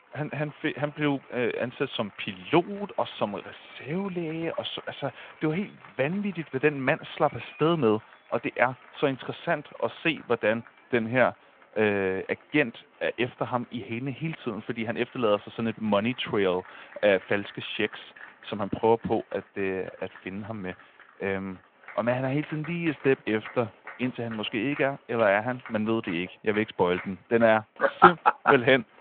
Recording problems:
phone-call audio
crowd noise; faint; throughout; 20 dB below the speech

